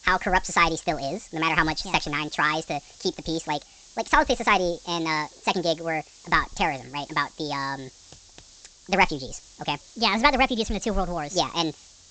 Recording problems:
wrong speed and pitch; too fast and too high; 1.5 times normal speed
high frequencies cut off; noticeable; nothing above 8 kHz
hiss; faint; throughout; 25 dB below the speech

